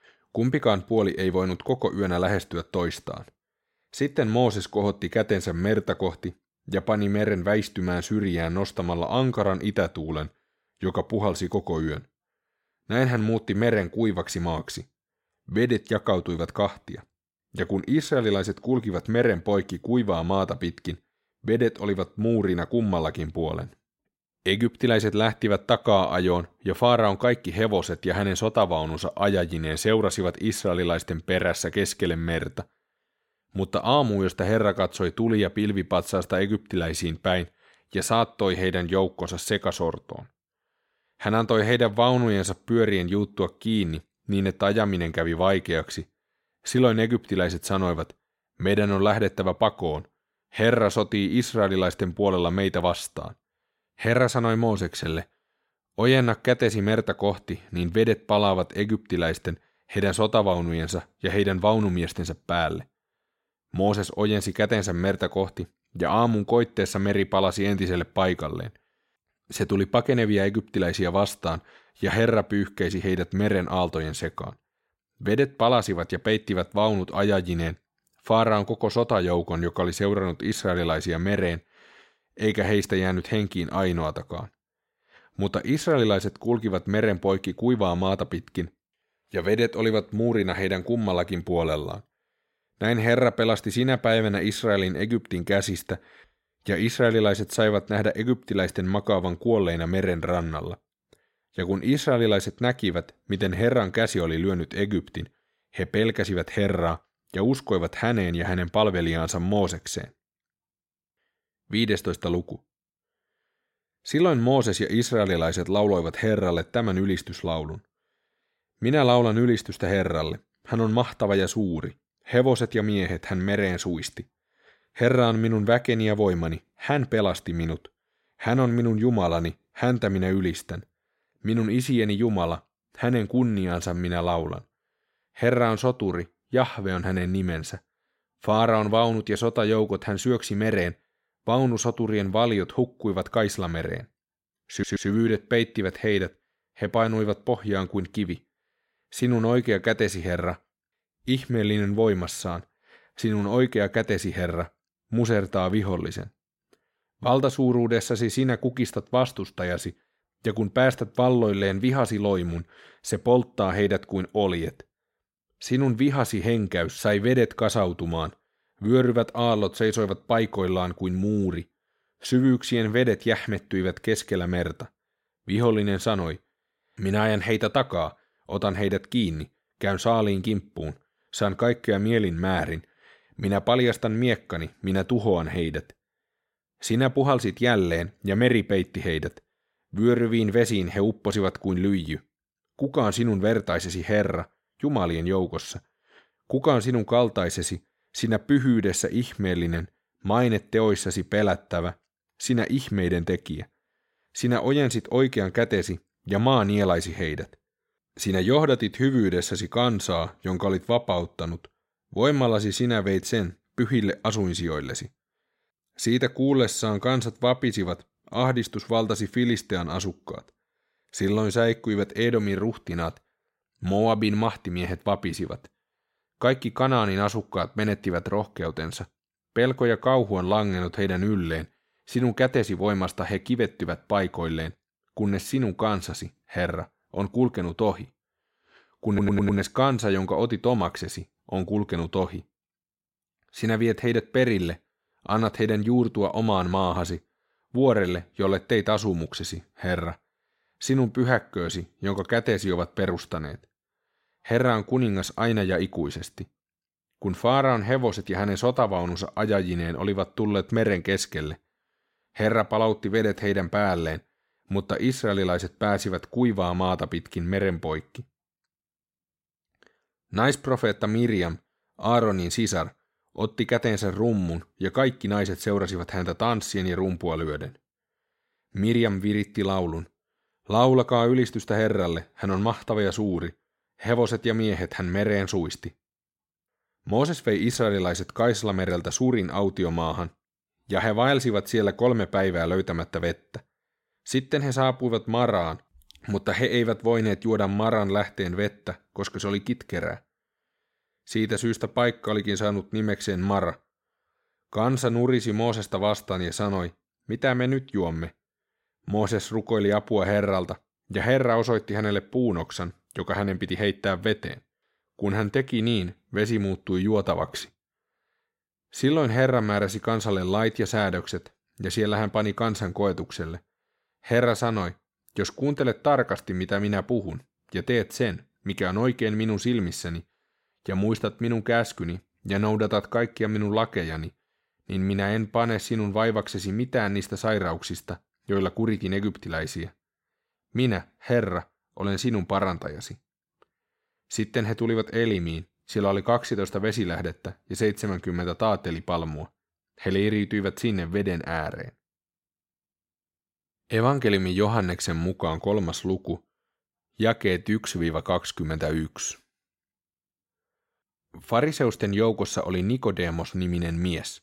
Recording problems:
audio stuttering; at 2:25 and at 3:59

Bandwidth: 16 kHz